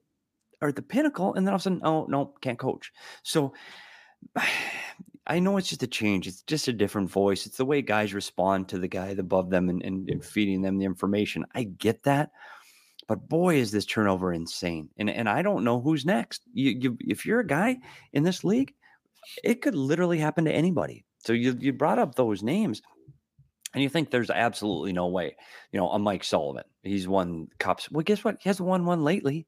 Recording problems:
none

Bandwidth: 15 kHz